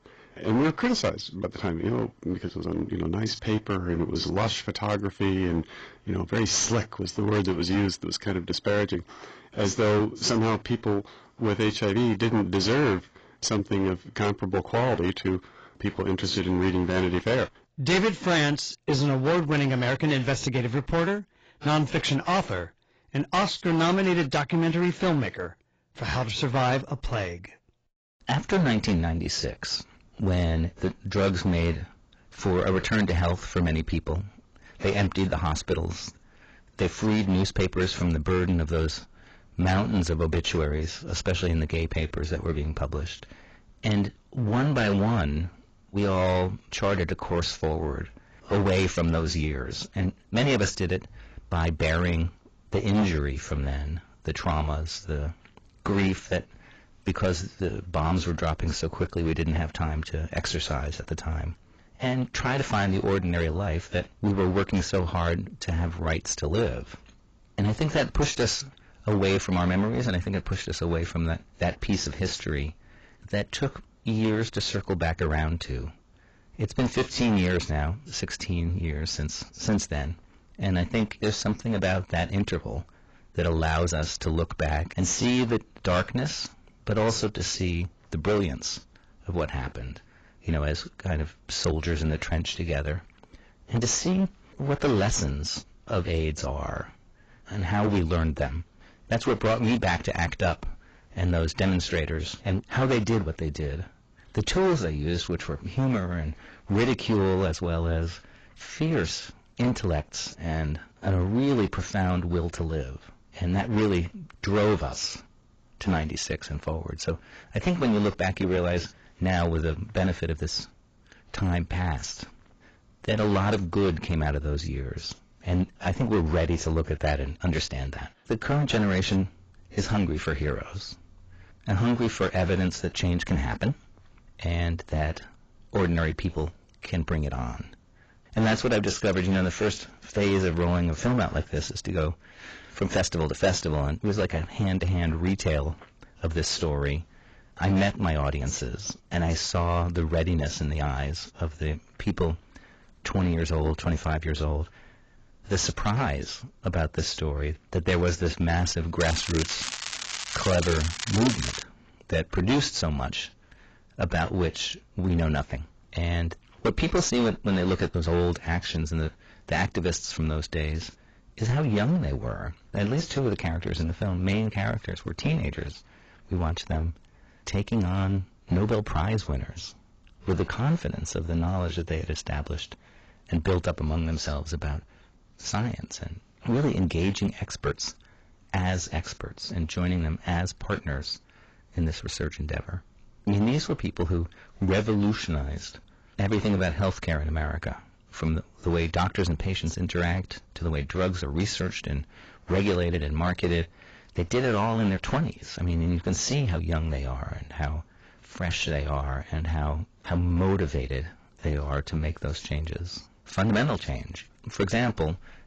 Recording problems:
distortion; heavy; 12% of the sound clipped
garbled, watery; badly; nothing above 7.5 kHz
crackling; loud; from 2:39 to 2:42; 5 dB below the speech

